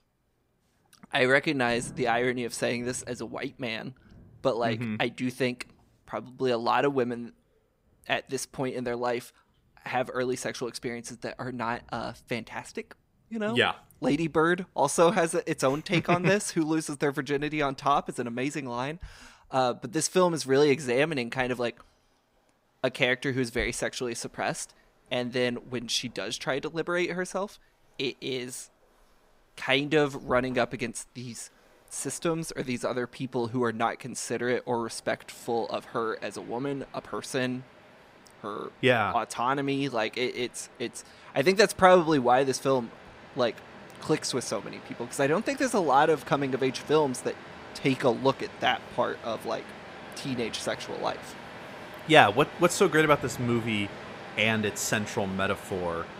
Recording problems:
rain or running water; noticeable; throughout; 20 dB below the speech

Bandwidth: 15.5 kHz